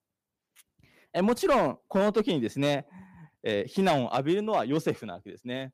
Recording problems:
distortion; slight; 3% of the sound clipped

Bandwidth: 15 kHz